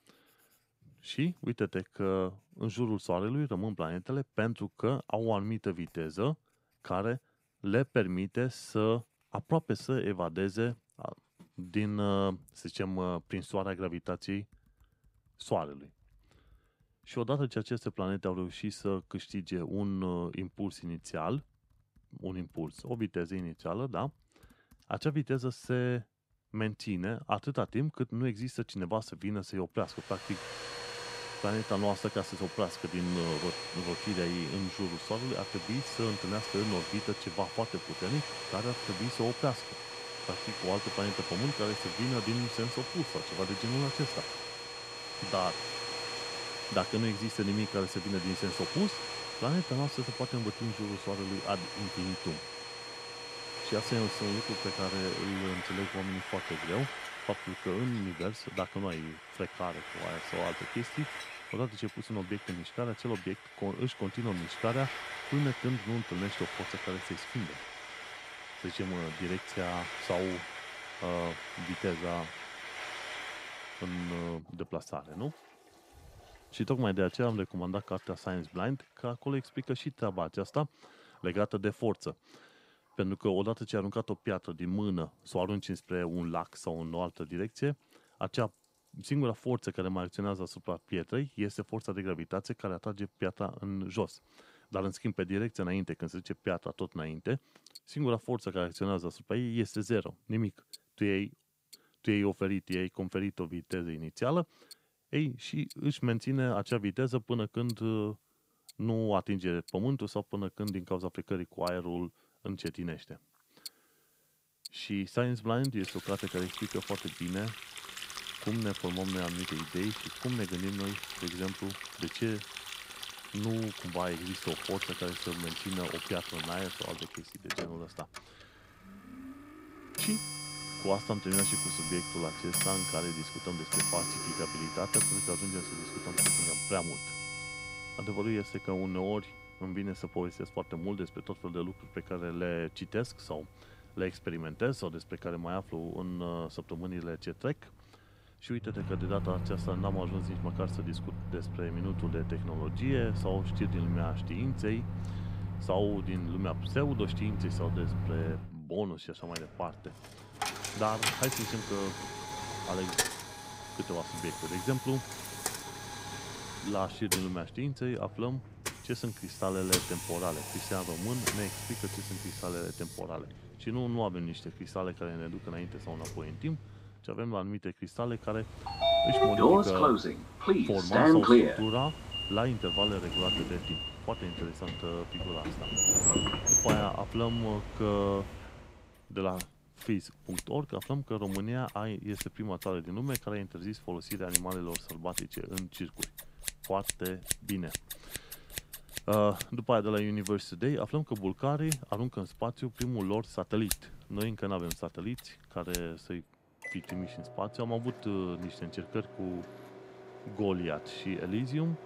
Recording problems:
household noises; very loud; throughout; as loud as the speech

